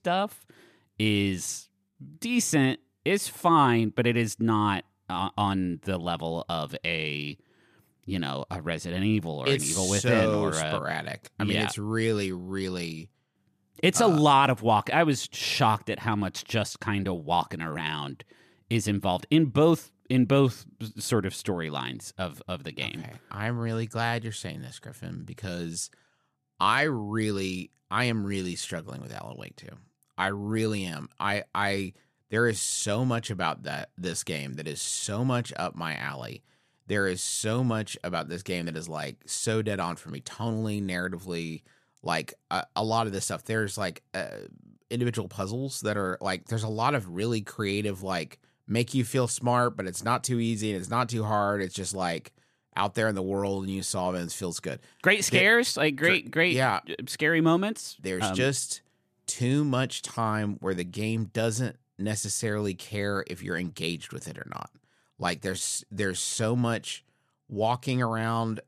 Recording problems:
none

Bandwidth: 14.5 kHz